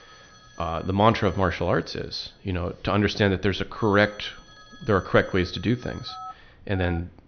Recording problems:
high frequencies cut off; noticeable; nothing above 6 kHz
alarms or sirens; faint; throughout; 20 dB below the speech

